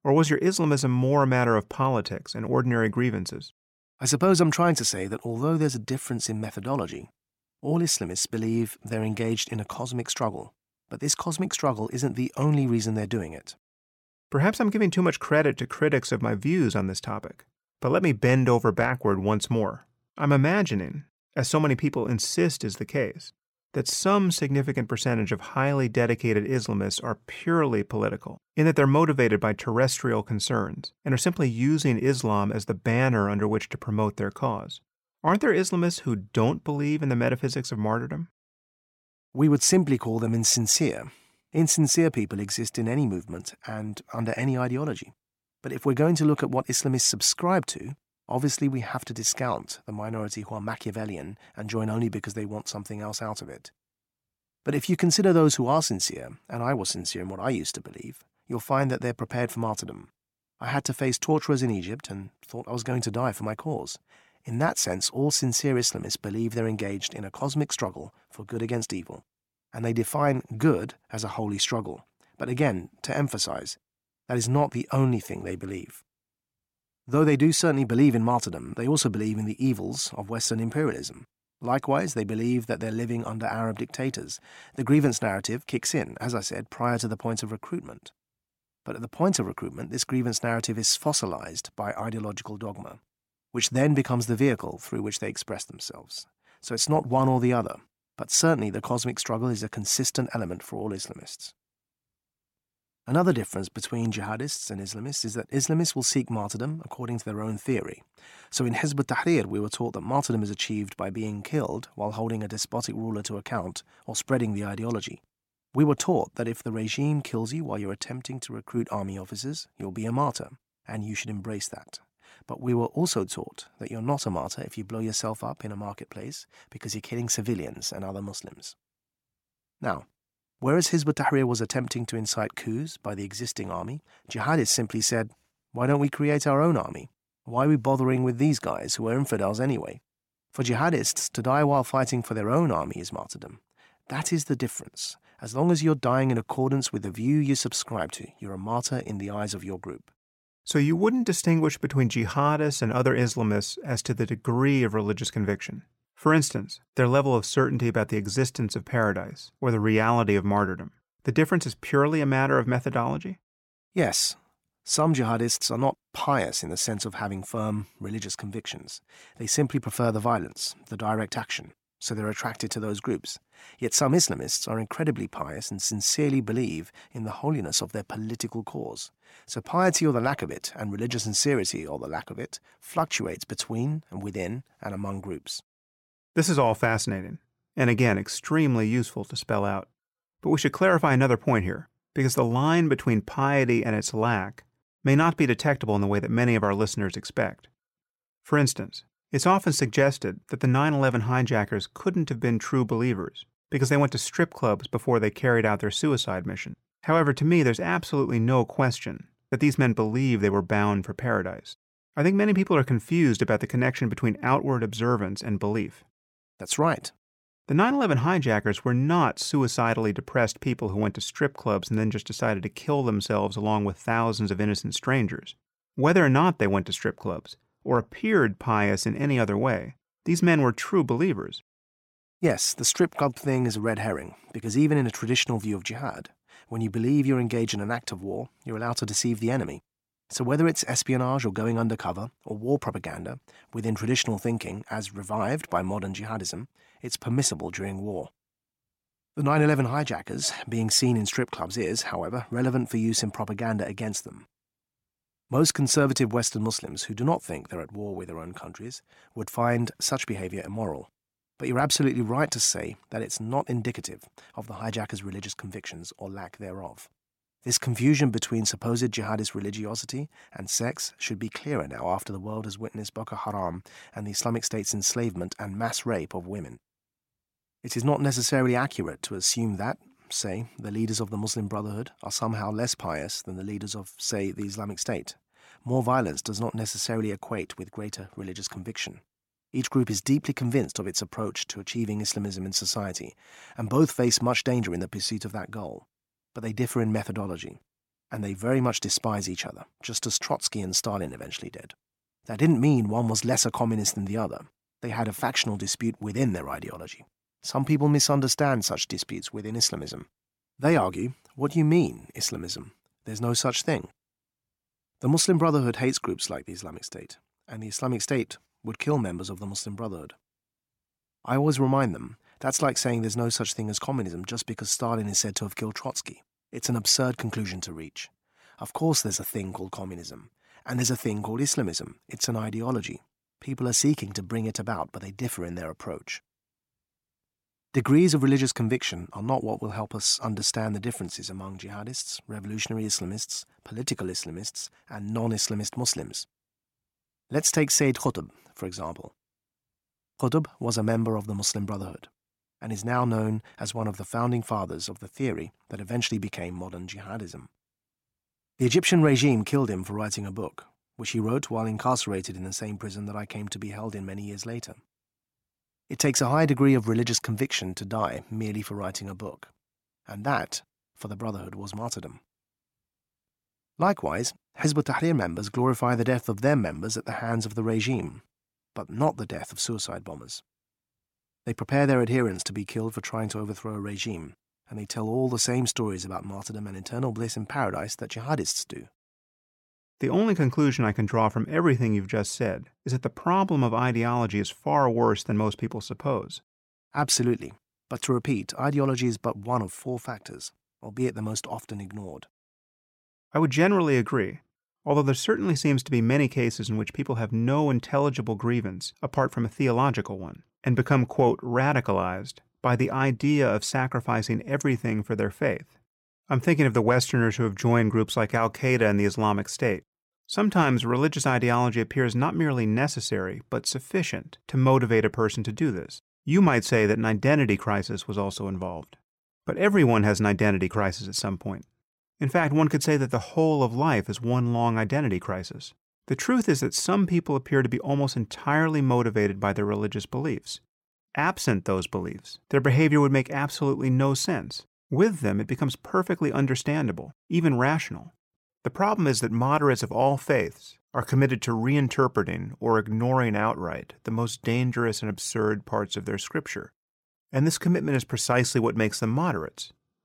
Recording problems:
none

